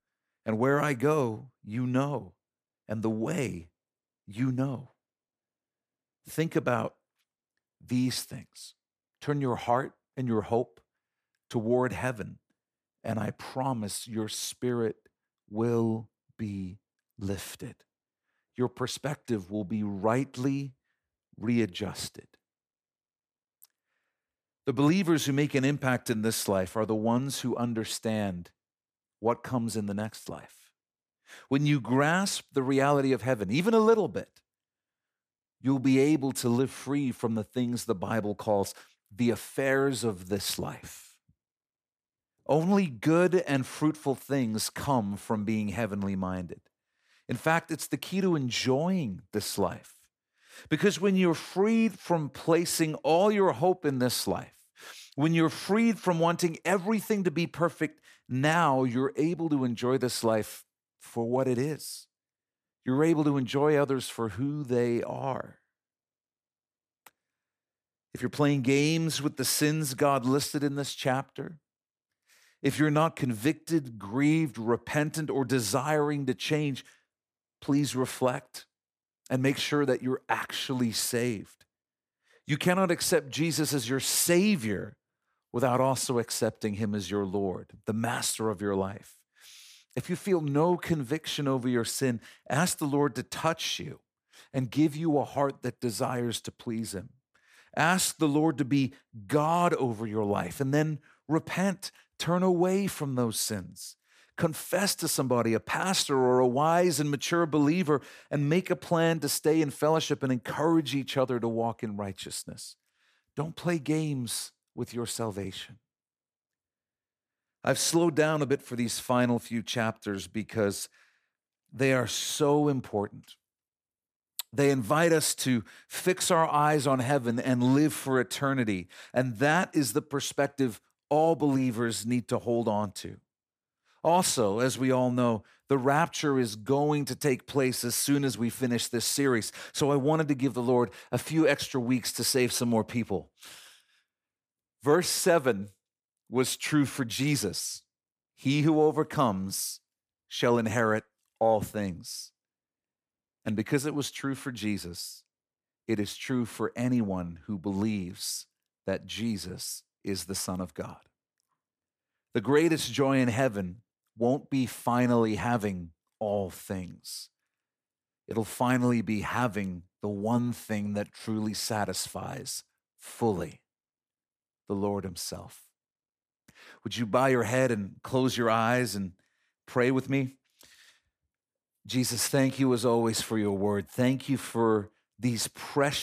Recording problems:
abrupt cut into speech; at the end

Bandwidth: 14.5 kHz